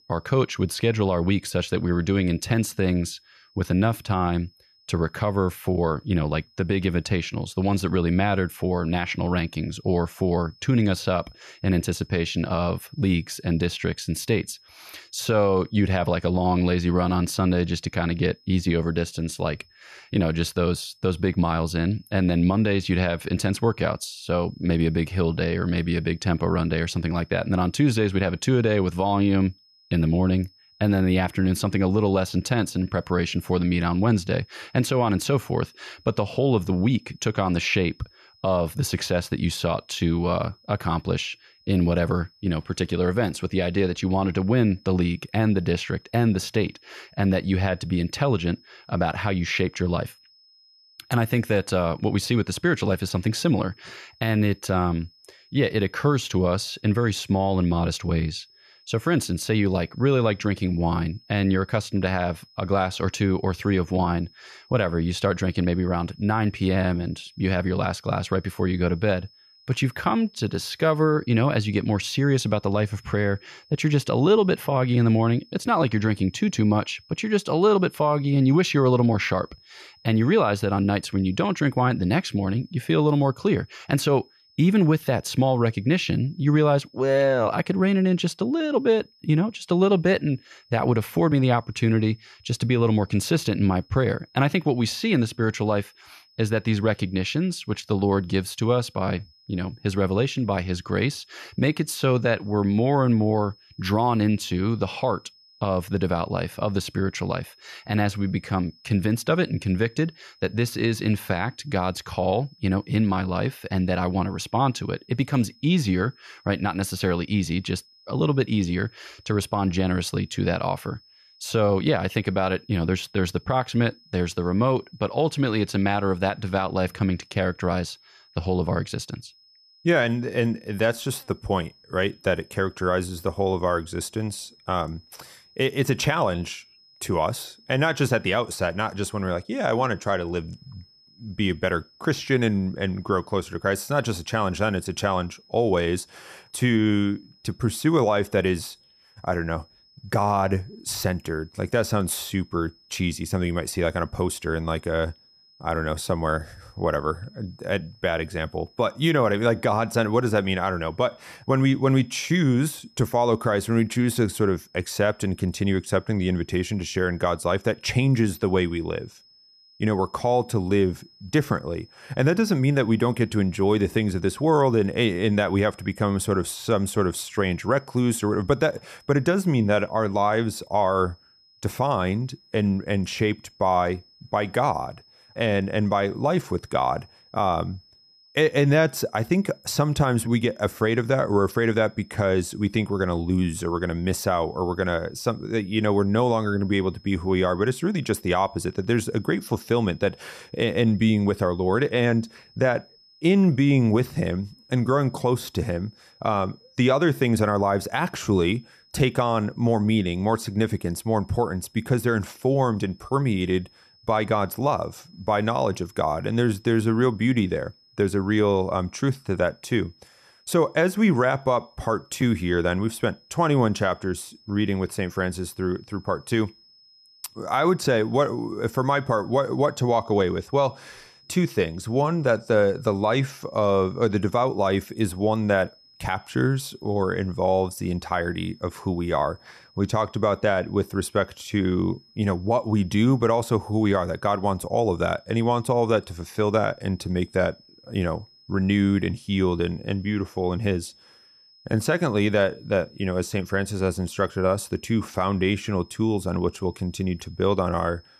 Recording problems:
high-pitched whine; faint; throughout; 5 kHz, 30 dB below the speech

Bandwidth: 14 kHz